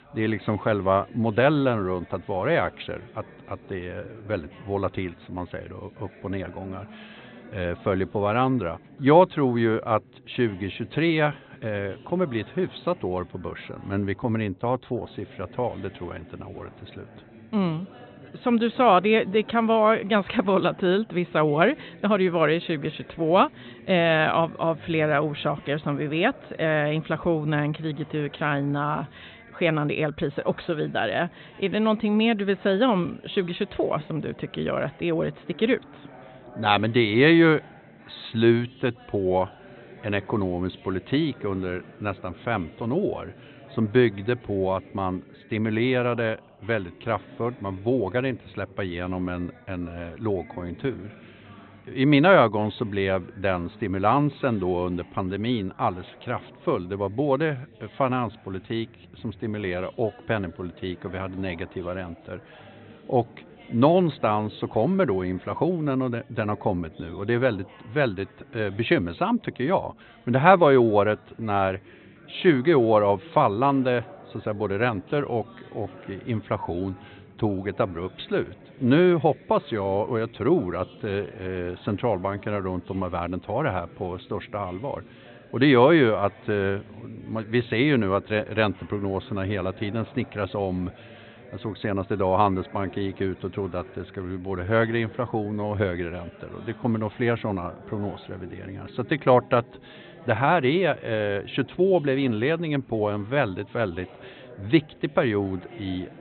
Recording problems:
high frequencies cut off; severe; nothing above 4 kHz
background chatter; faint; throughout; 3 voices, 25 dB below the speech

